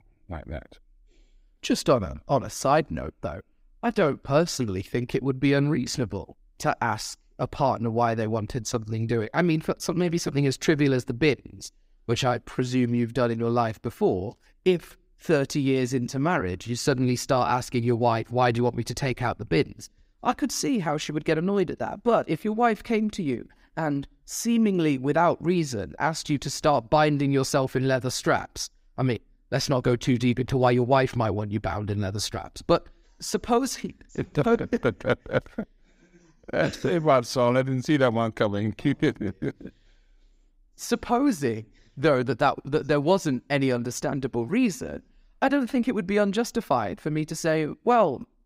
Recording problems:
none

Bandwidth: 15.5 kHz